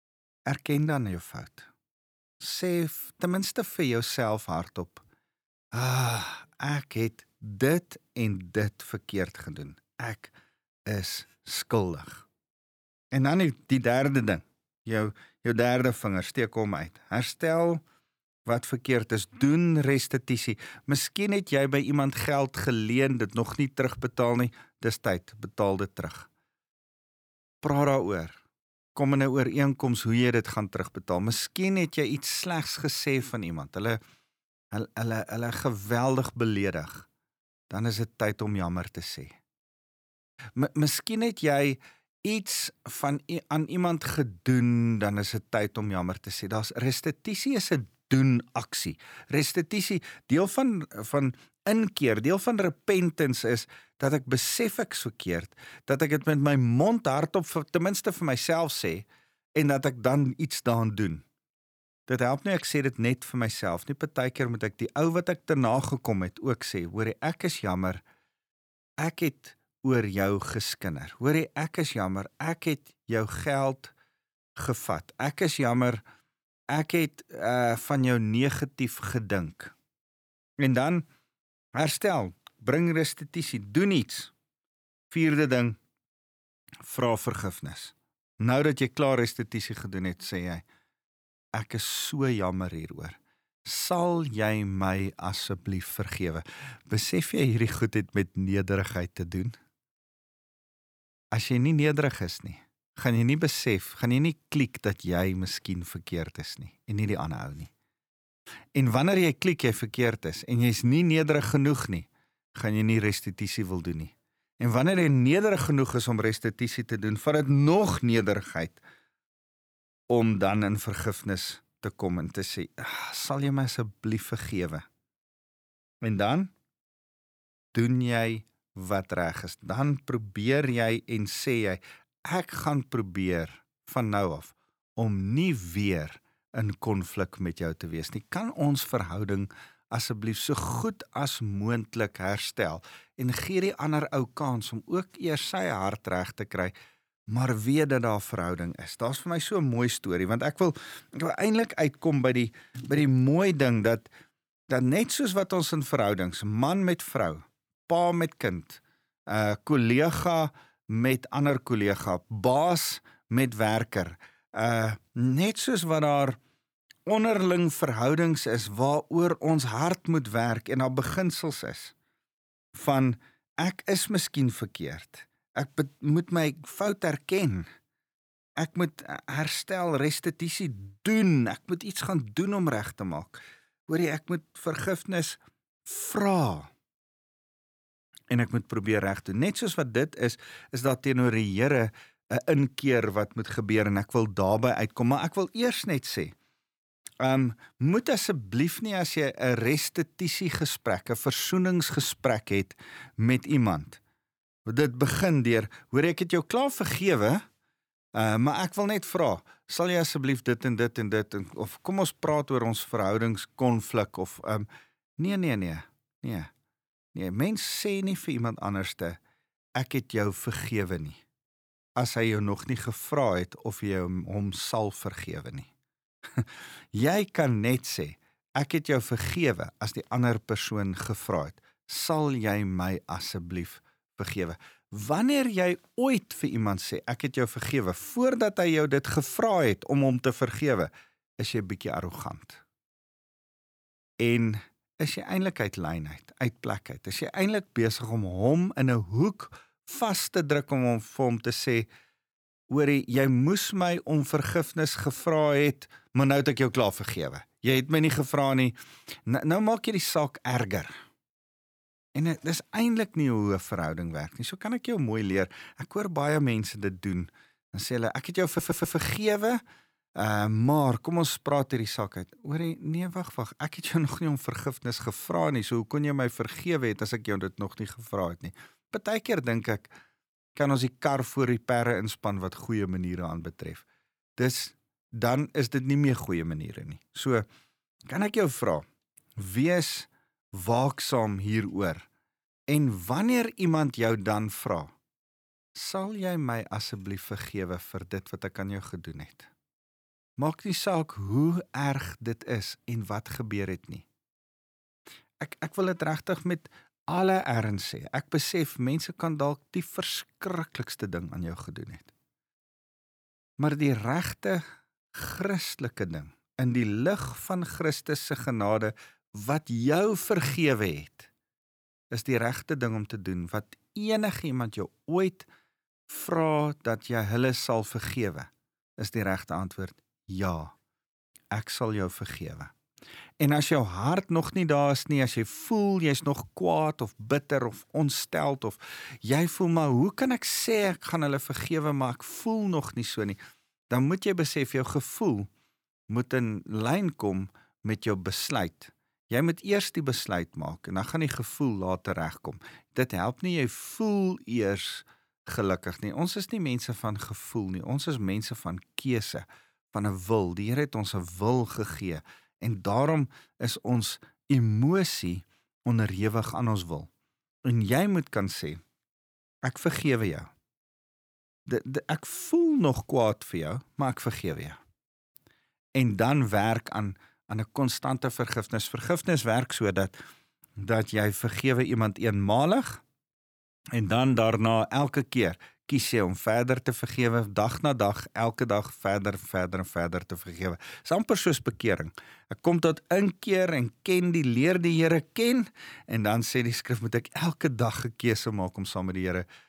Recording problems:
audio stuttering; at 4:28

